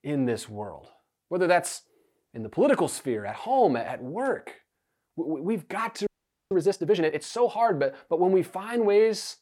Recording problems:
audio freezing; at 6 s

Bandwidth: 17.5 kHz